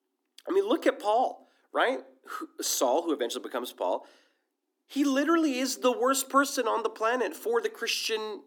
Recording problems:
thin; somewhat; fading below 250 Hz

